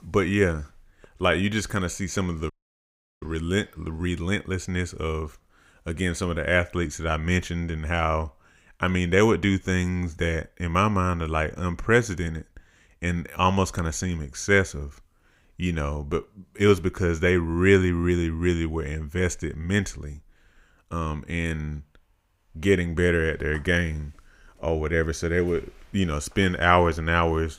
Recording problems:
audio cutting out; at 2.5 s for 0.5 s

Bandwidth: 15.5 kHz